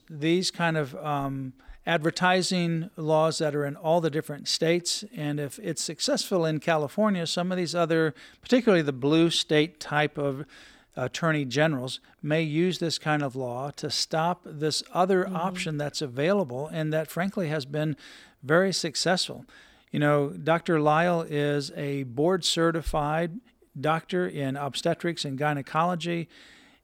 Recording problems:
none

